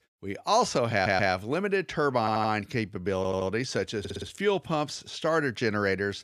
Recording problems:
audio stuttering; 4 times, first at 1 s

